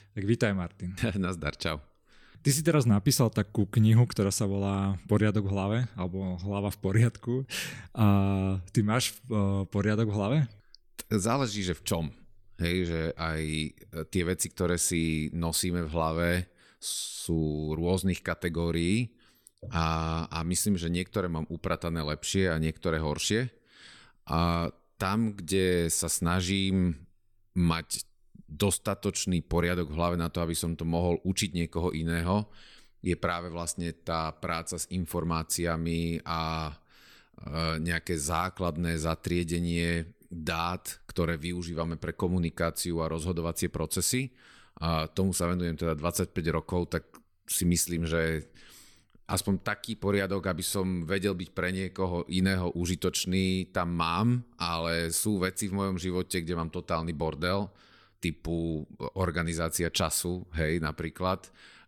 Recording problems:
none

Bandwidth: 17.5 kHz